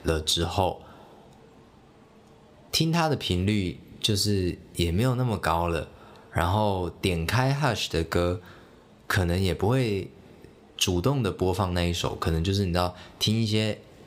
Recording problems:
squashed, flat; somewhat

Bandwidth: 15.5 kHz